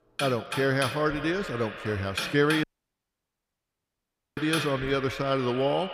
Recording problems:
echo of what is said; strong; throughout; 160 ms later, 10 dB below the speech
household noises; loud; throughout; 7 dB below the speech
audio cutting out; at 2.5 s for 1.5 s

